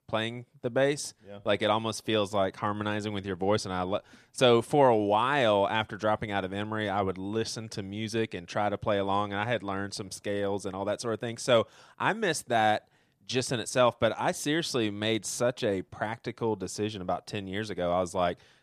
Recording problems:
none

